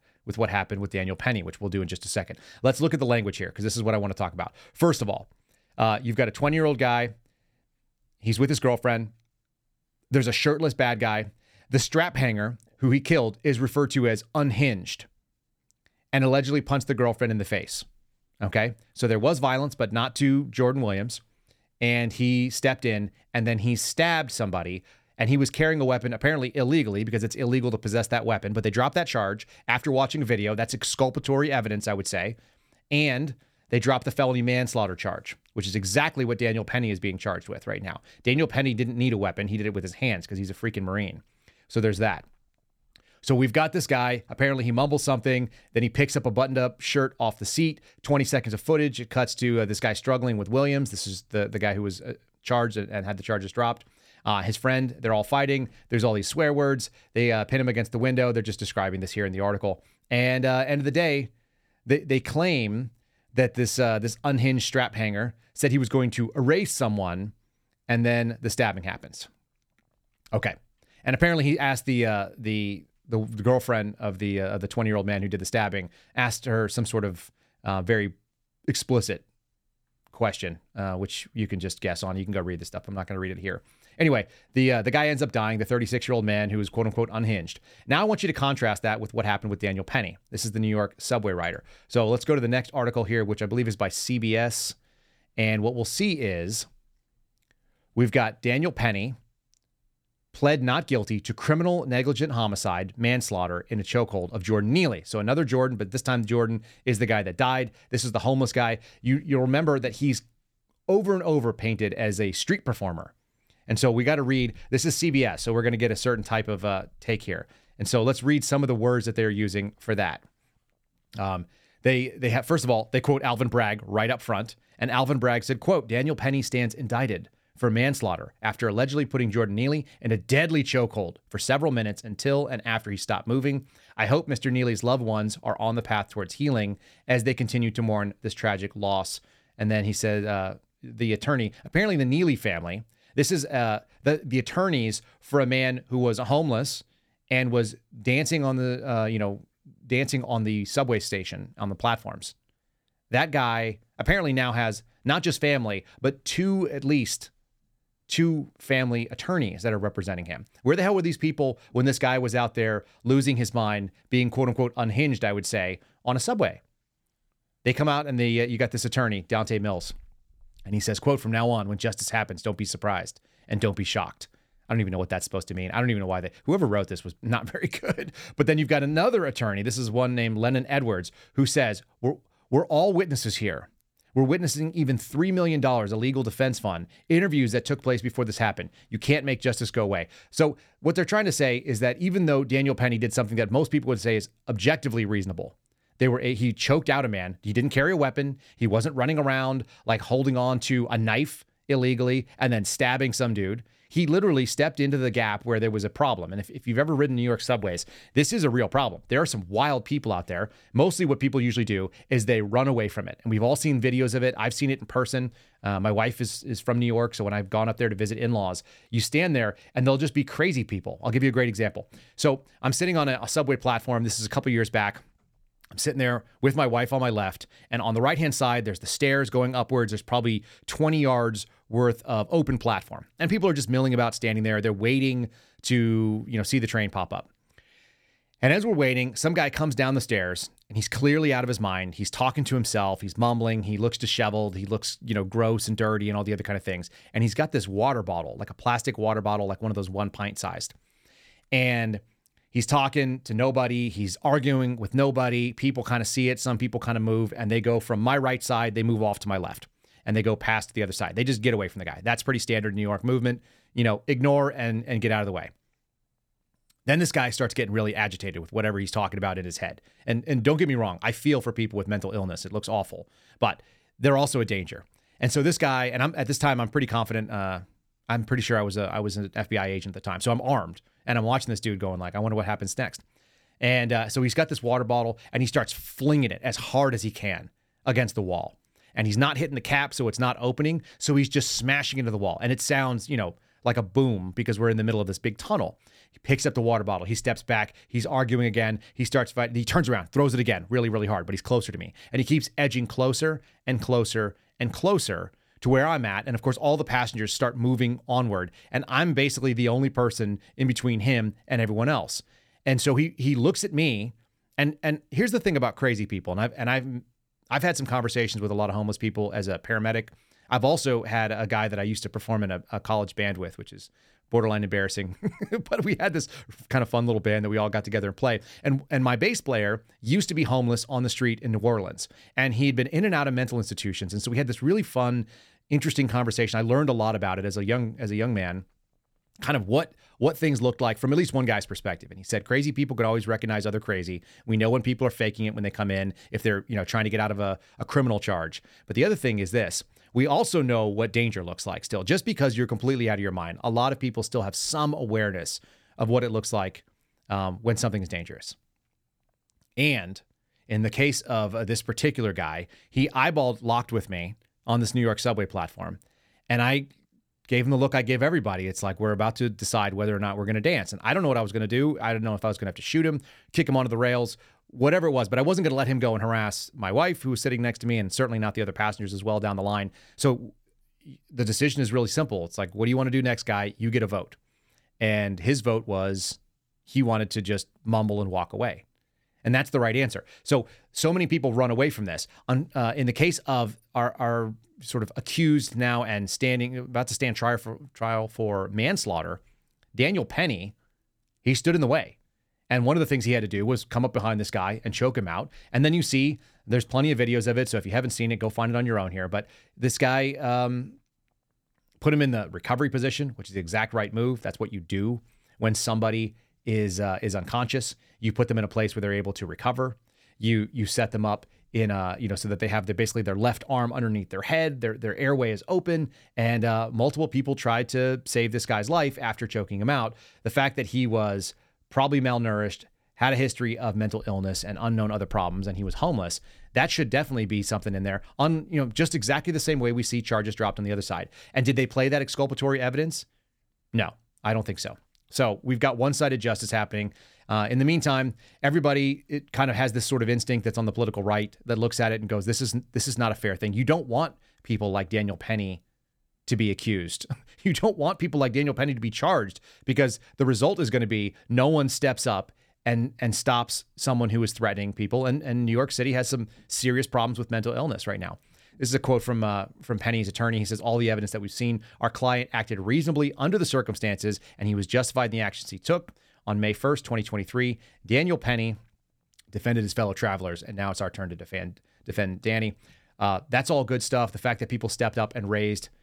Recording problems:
none

